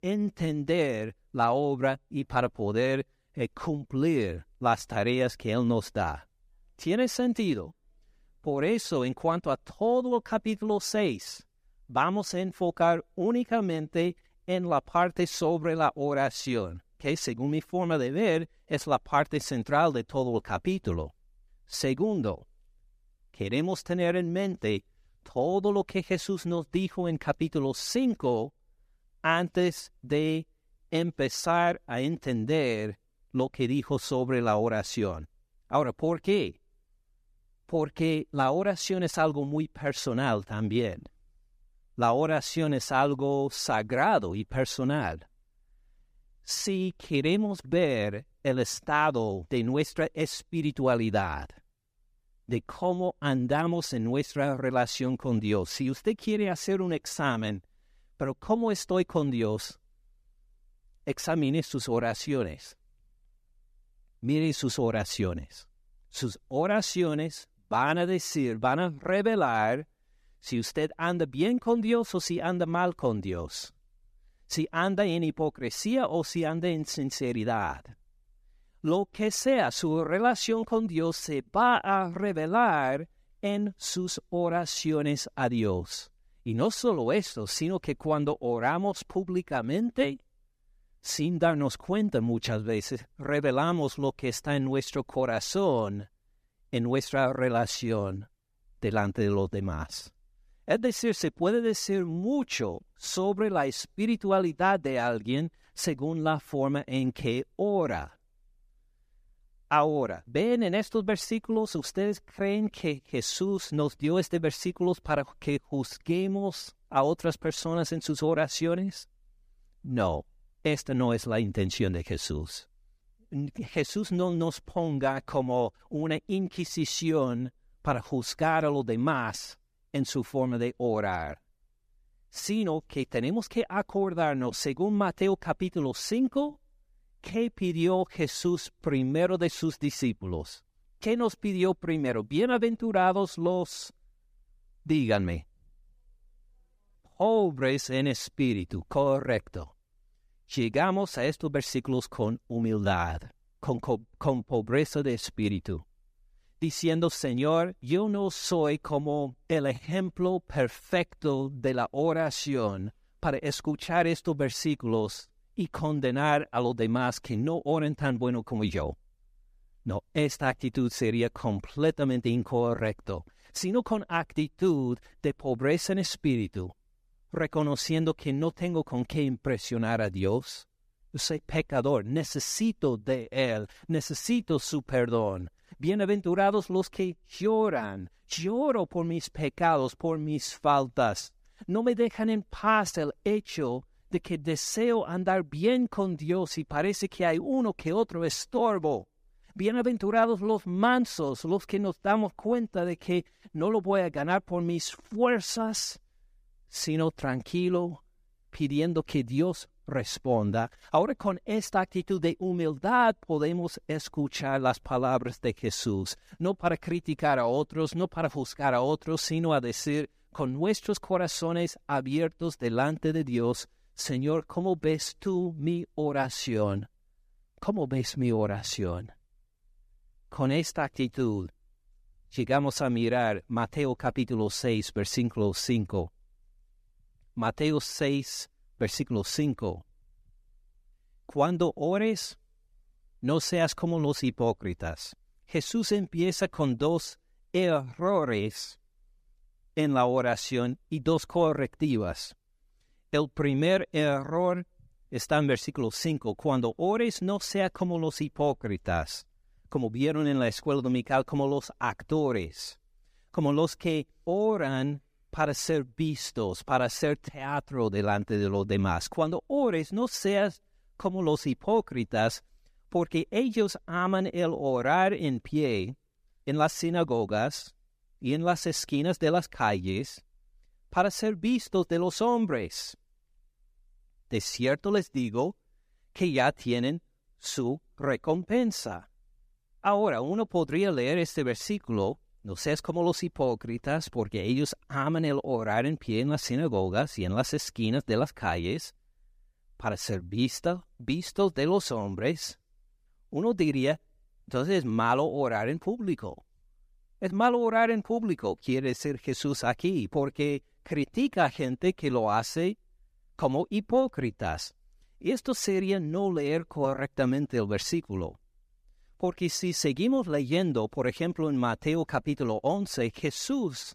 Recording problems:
none

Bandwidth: 15 kHz